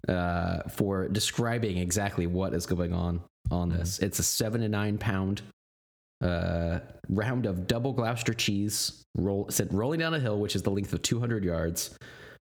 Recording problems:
squashed, flat; somewhat

